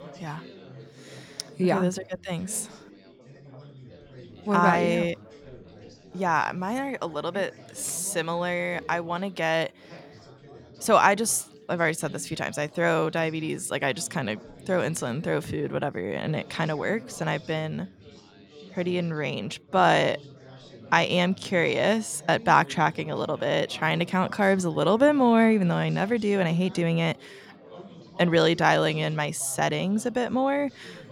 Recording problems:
chatter from many people; faint; throughout; 20 dB below the speech

